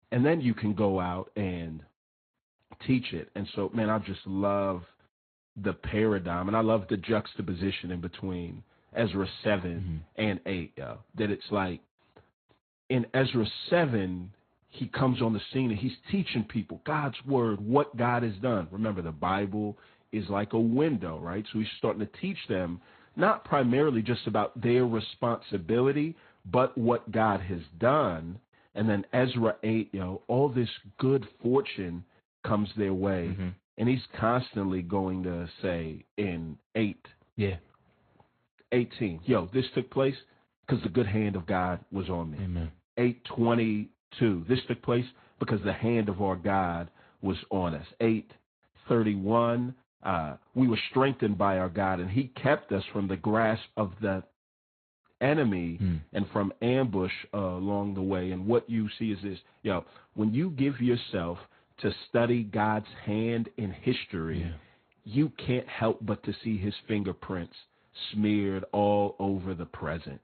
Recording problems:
high frequencies cut off; severe; nothing above 4 kHz
garbled, watery; slightly

